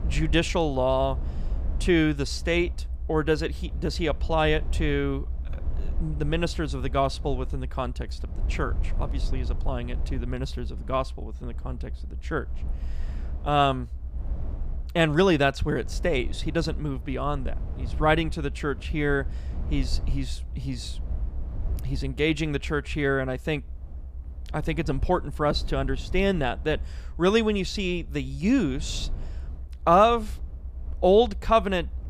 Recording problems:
low rumble; faint; throughout; 25 dB below the speech

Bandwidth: 14.5 kHz